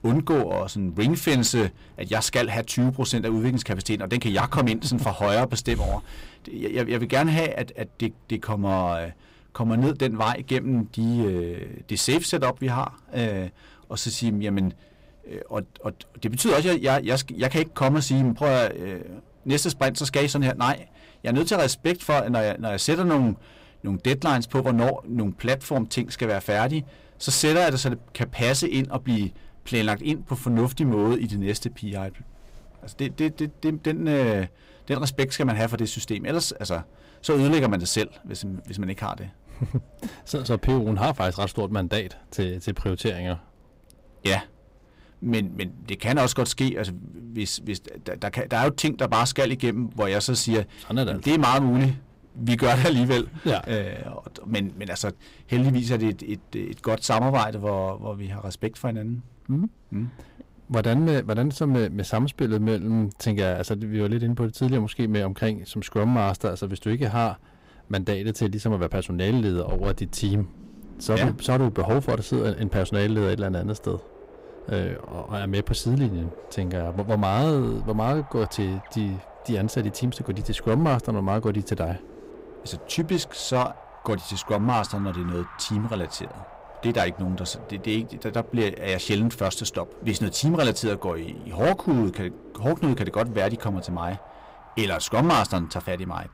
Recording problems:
distortion; slight; 7% of the sound clipped
wind in the background; faint; throughout; 25 dB below the speech

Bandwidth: 15.5 kHz